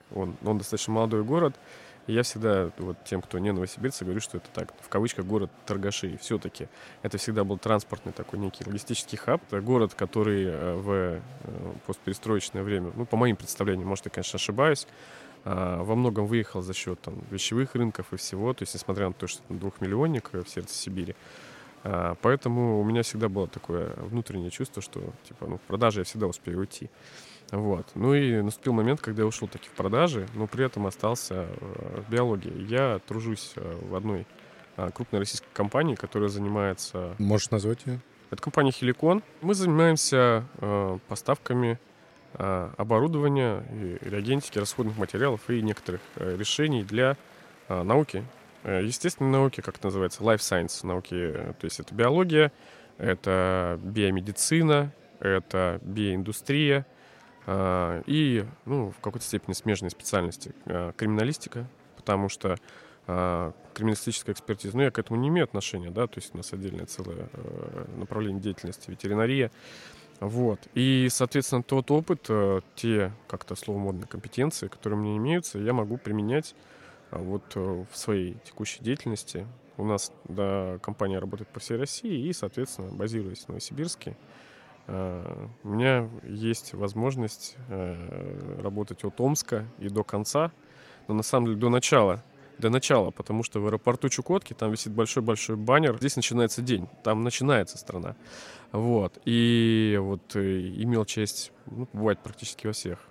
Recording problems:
murmuring crowd; faint; throughout; 25 dB below the speech

